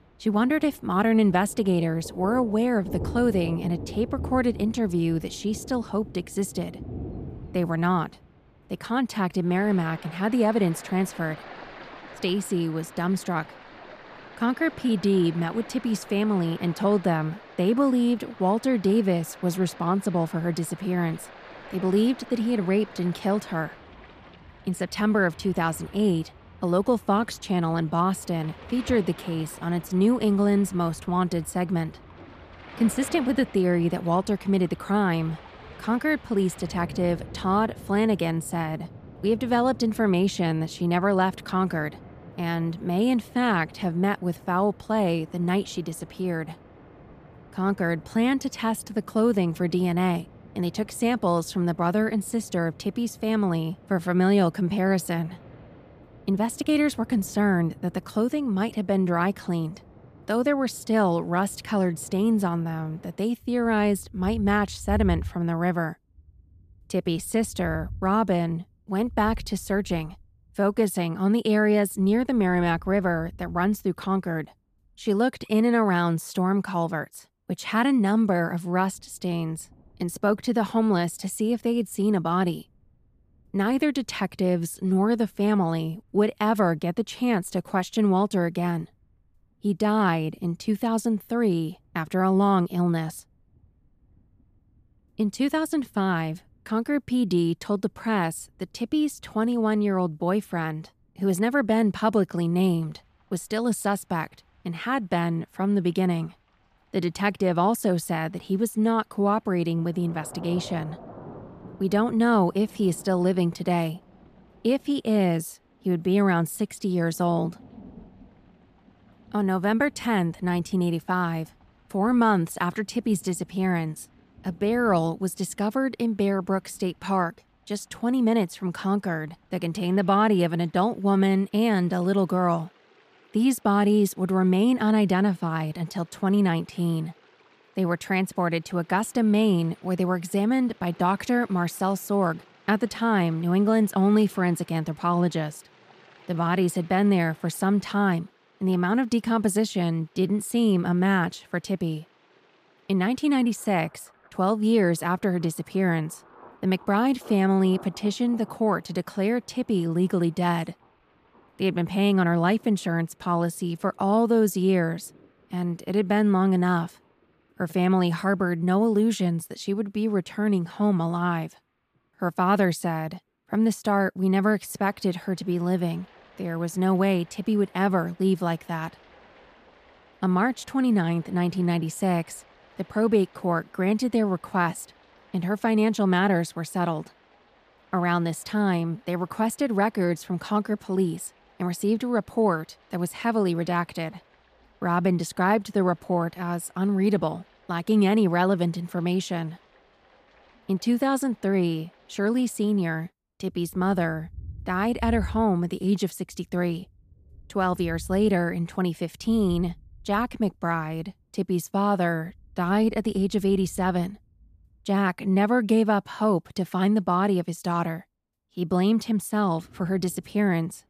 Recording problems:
rain or running water; faint; throughout; 20 dB below the speech

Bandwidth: 14.5 kHz